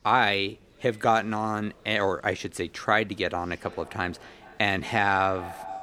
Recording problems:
echo of what is said; faint; from 3.5 s on; 210 ms later, 20 dB below the speech
chatter from many people; faint; throughout; 30 dB below the speech

